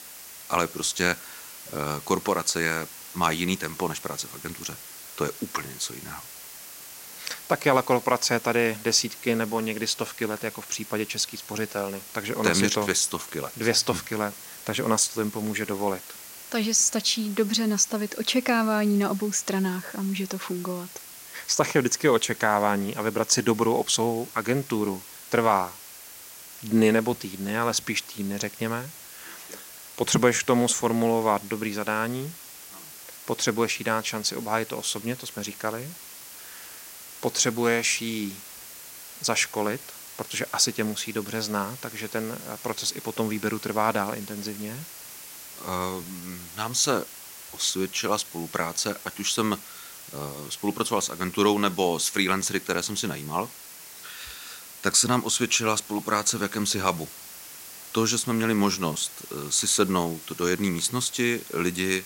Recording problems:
hiss; noticeable; throughout; 15 dB below the speech

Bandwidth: 16 kHz